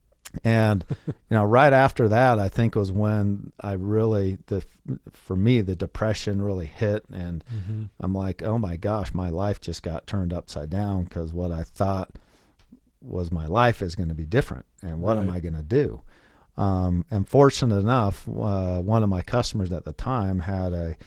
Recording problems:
garbled, watery; slightly; nothing above 15.5 kHz

